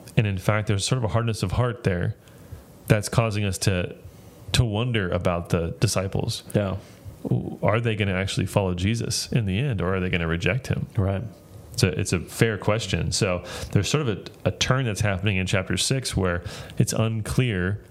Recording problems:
squashed, flat; somewhat

